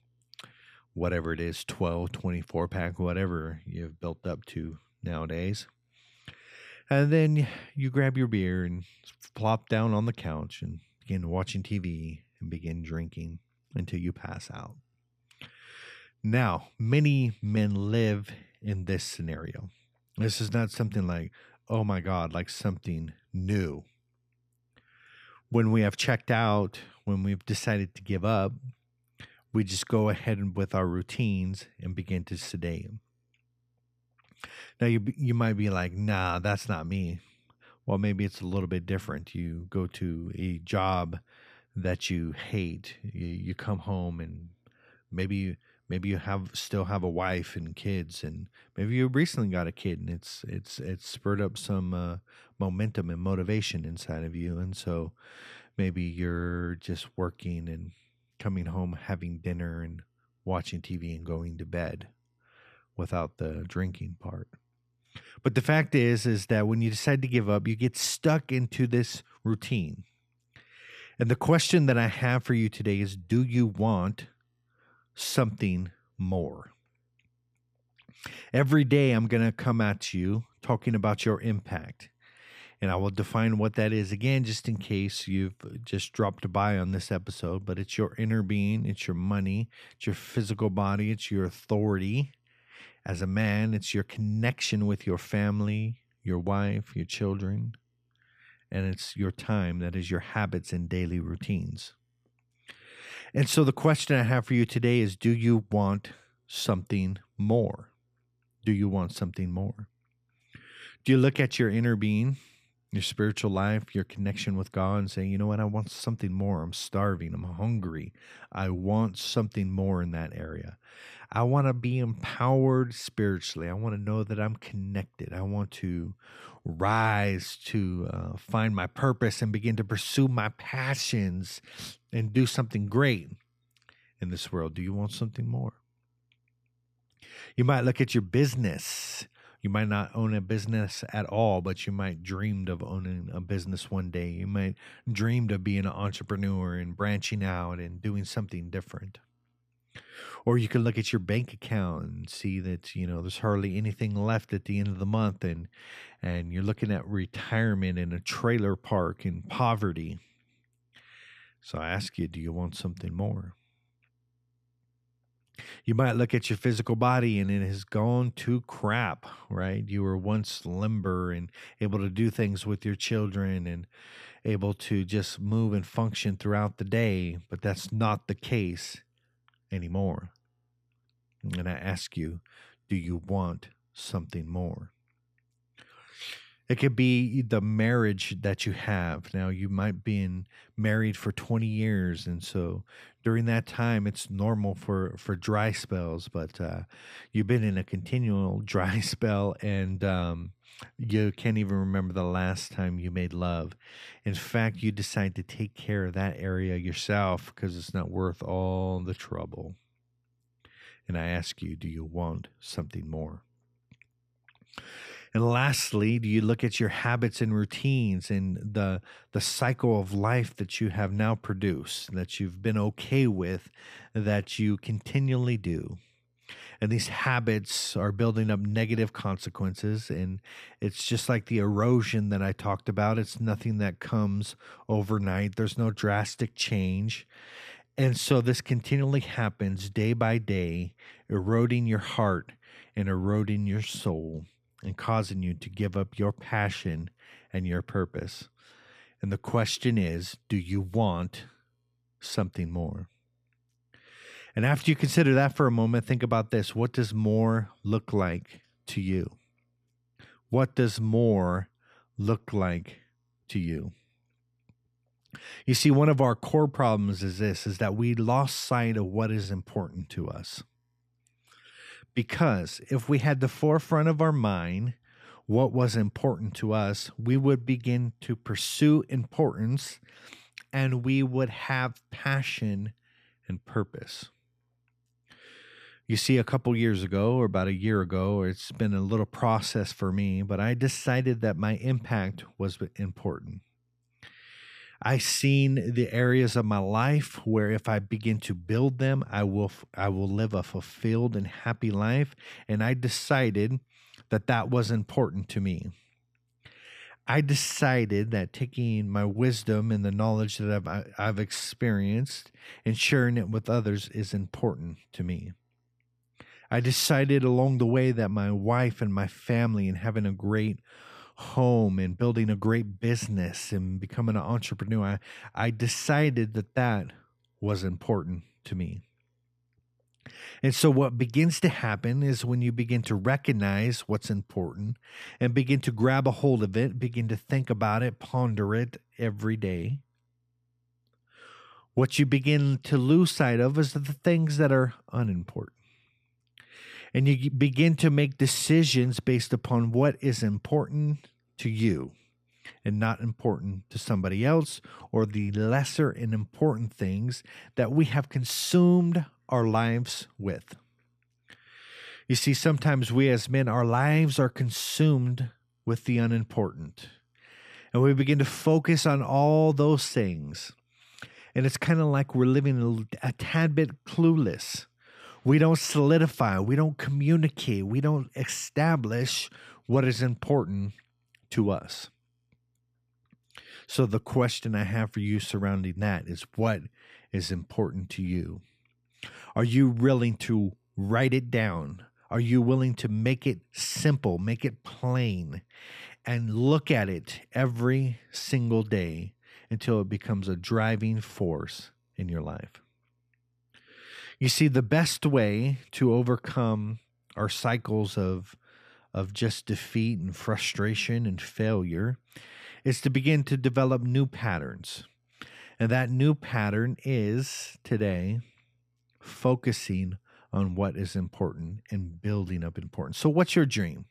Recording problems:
none

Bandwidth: 14.5 kHz